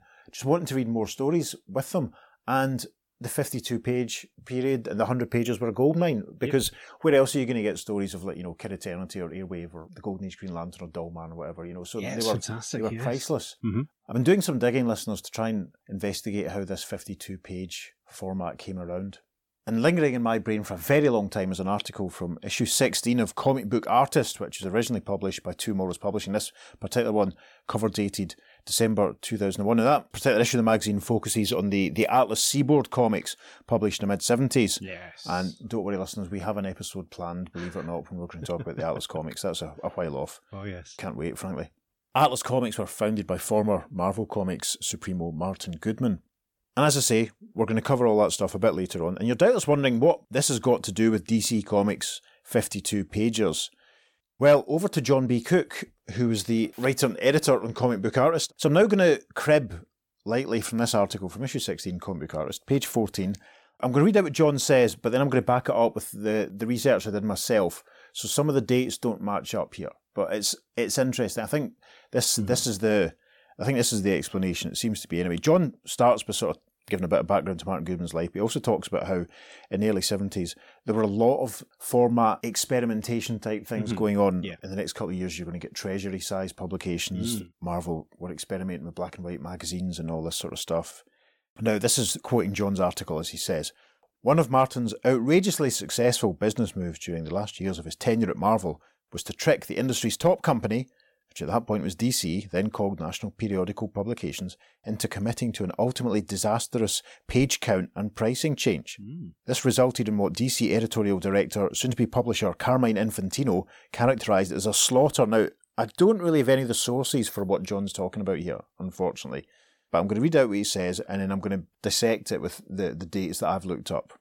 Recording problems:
none

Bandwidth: 17.5 kHz